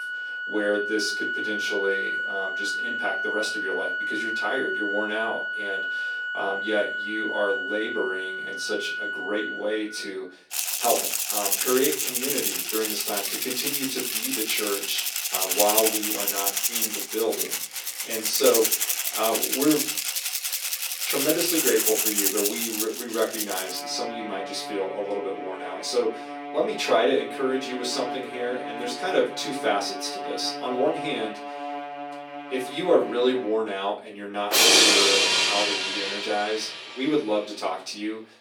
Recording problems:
off-mic speech; far
thin; somewhat; fading below 350 Hz
room echo; slight; dies away in 0.3 s
background music; very loud; throughout; 3 dB above the speech

